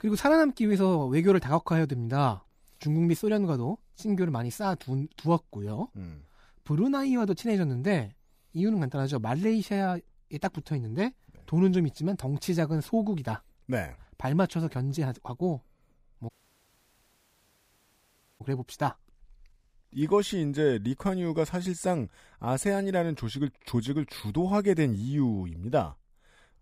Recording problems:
audio cutting out; at 16 s for 2 s

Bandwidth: 15 kHz